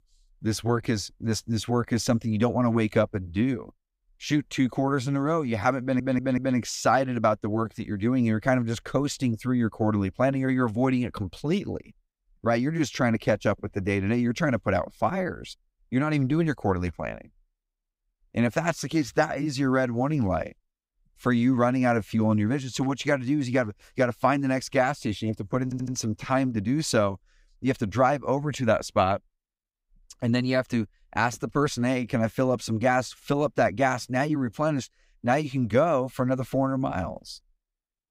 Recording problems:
audio stuttering; at 6 s and at 26 s

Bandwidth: 15.5 kHz